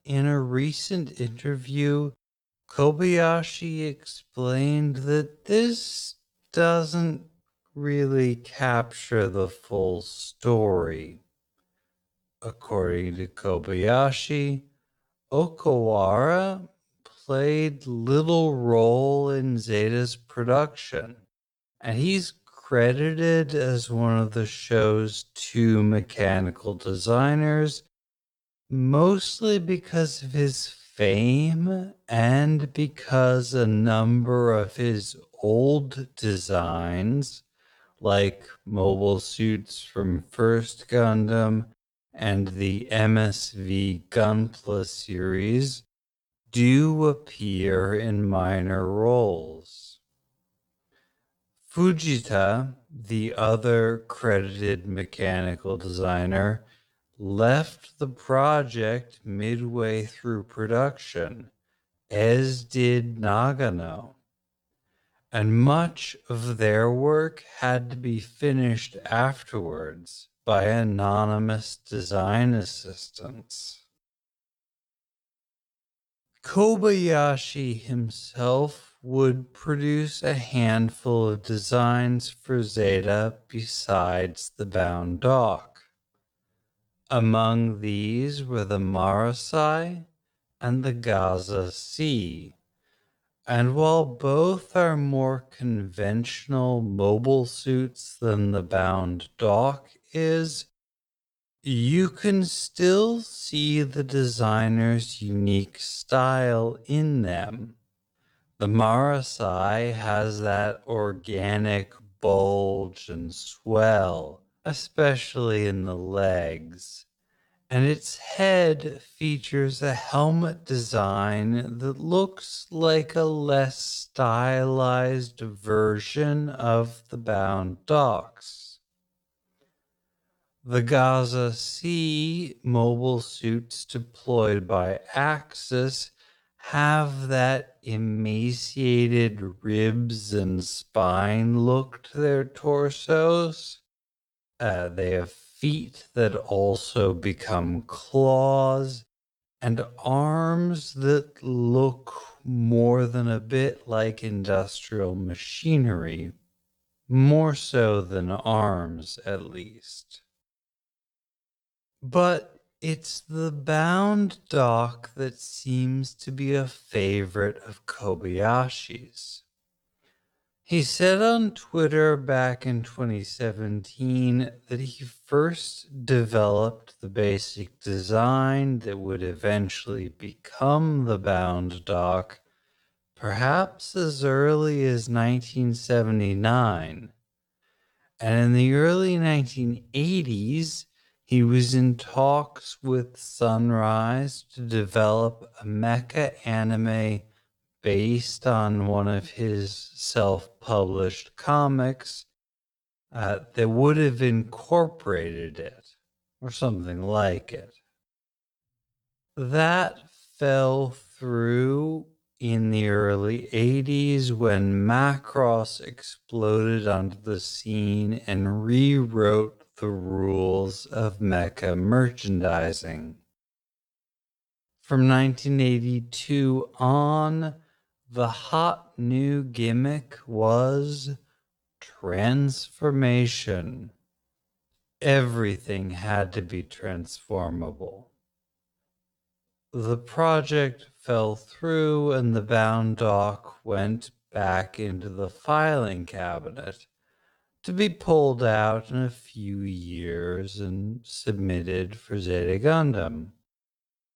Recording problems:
wrong speed, natural pitch; too slow; 0.5 times normal speed

